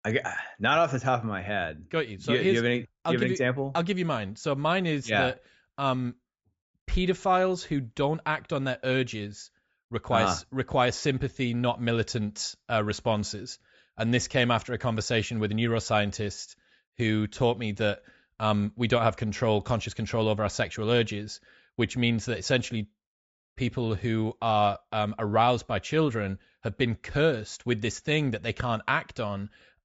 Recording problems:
high frequencies cut off; noticeable; nothing above 8 kHz

